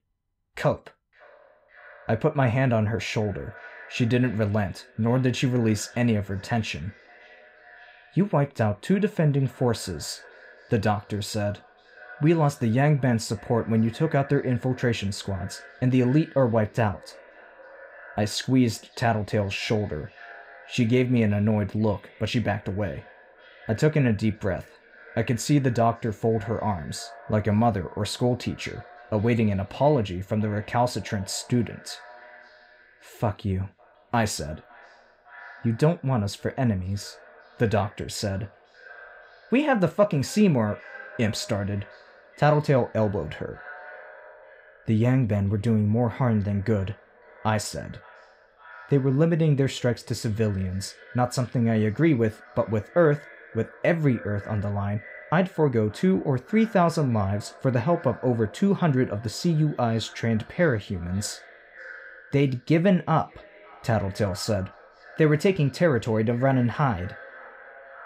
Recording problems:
echo of what is said; faint; throughout; 560 ms later, 20 dB below the speech

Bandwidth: 15.5 kHz